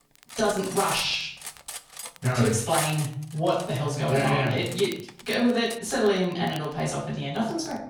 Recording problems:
off-mic speech; far
room echo; noticeable; dies away in 0.5 s
crackle, like an old record; faint; 25 dB below the speech
clattering dishes; noticeable; until 6 s; peak 3 dB below the speech

